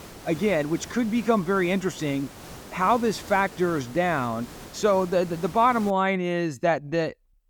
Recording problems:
hiss; noticeable; until 6 s; 15 dB below the speech

